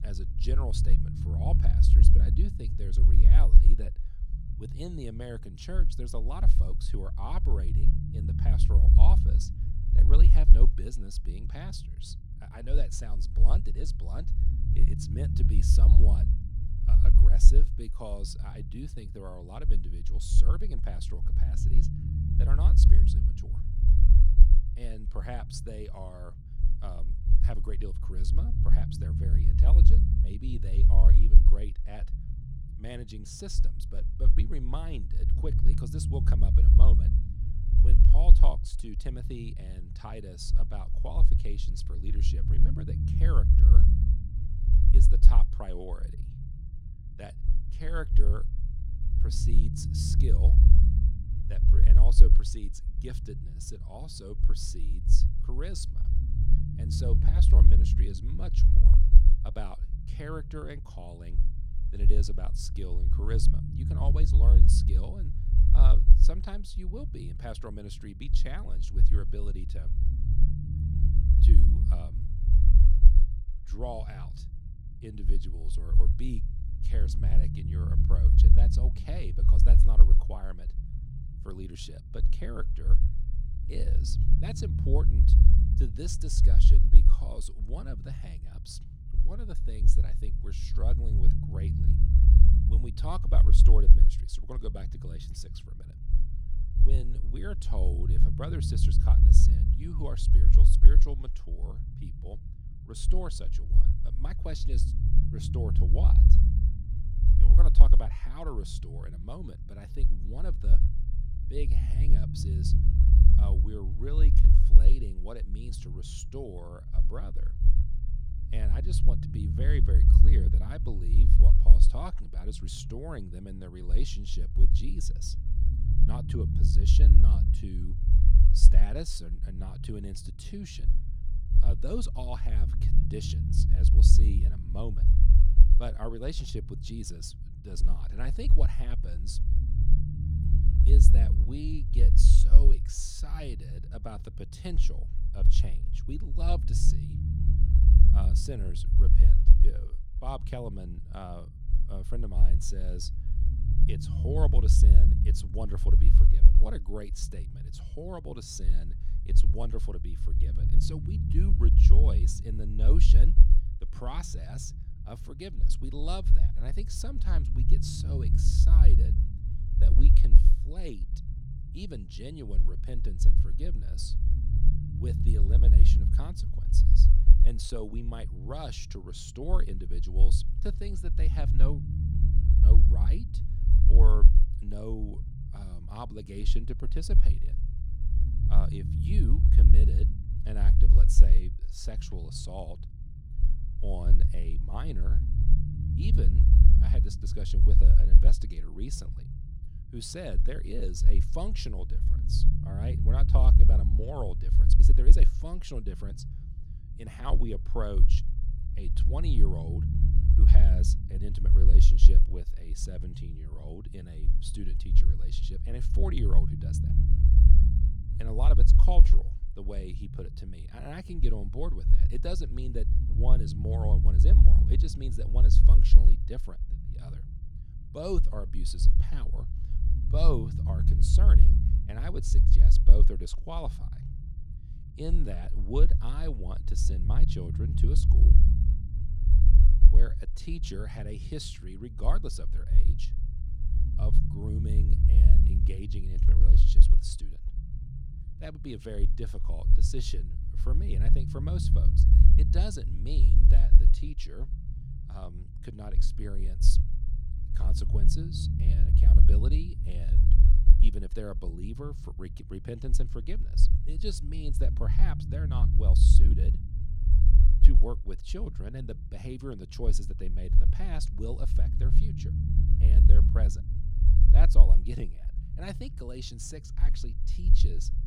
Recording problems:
low rumble; loud; throughout; 2 dB below the speech

